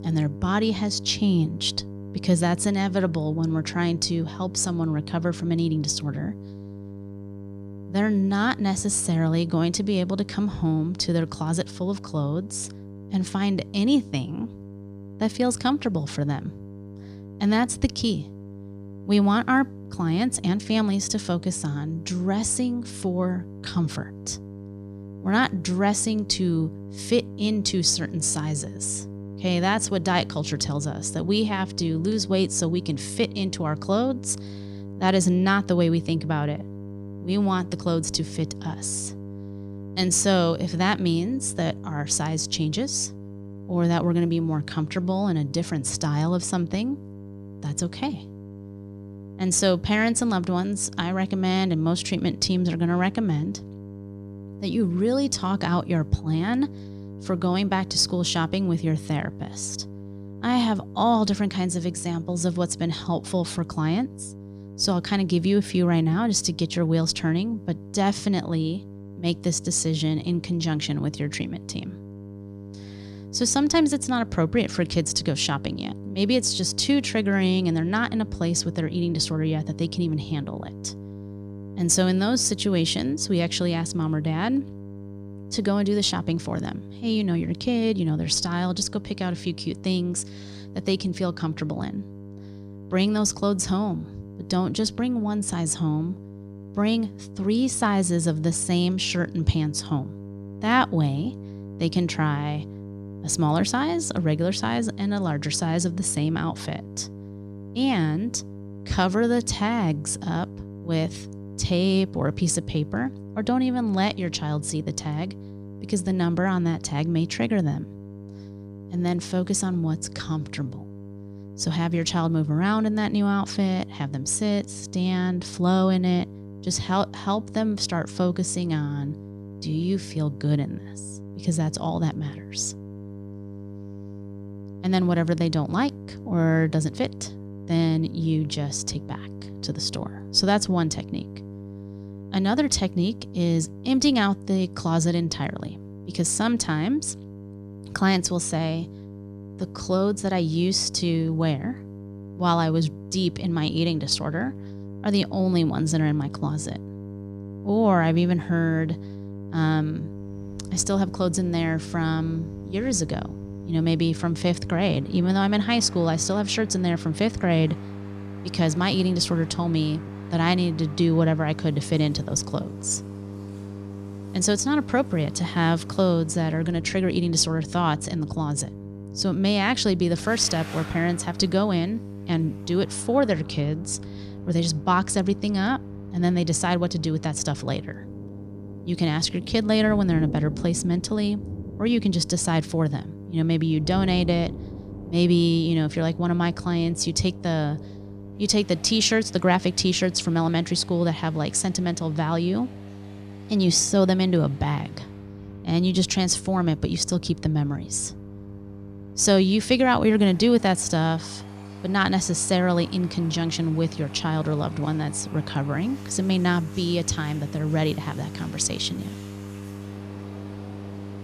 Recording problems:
electrical hum; noticeable; throughout; 50 Hz, 20 dB below the speech
rain or running water; faint; from 2:40 on; 20 dB below the speech

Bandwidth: 14.5 kHz